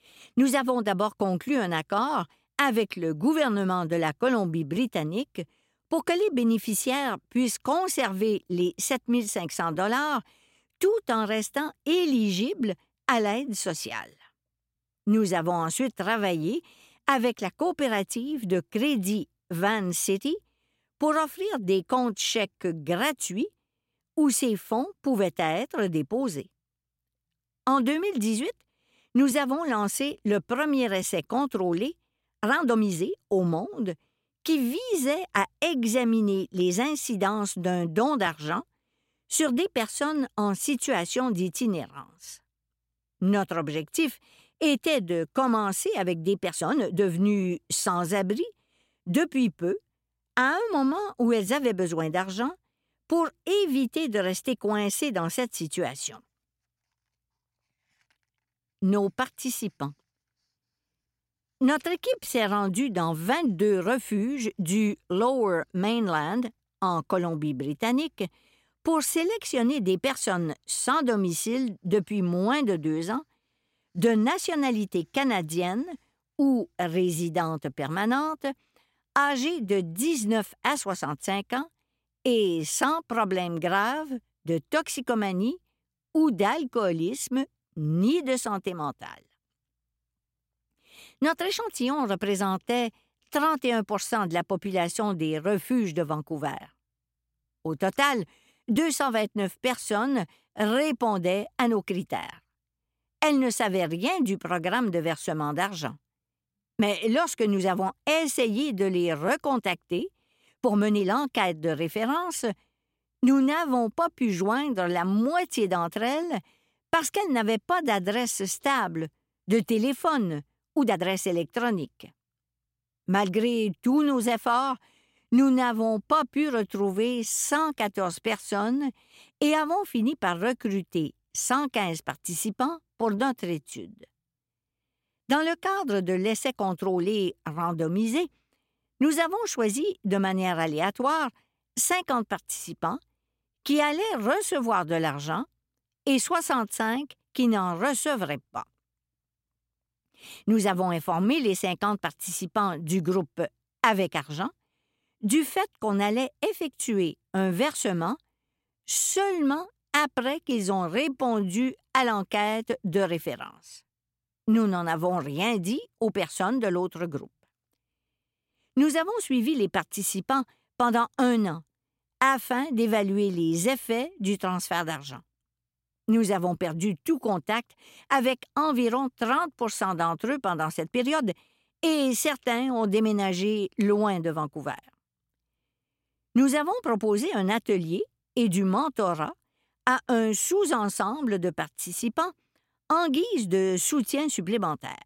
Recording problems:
uneven, jittery; strongly; from 22 s to 3:02

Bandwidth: 16 kHz